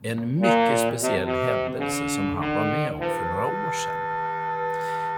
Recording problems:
background music; very loud; throughout; 5 dB above the speech
low rumble; faint; throughout; 20 dB below the speech

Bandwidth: 17.5 kHz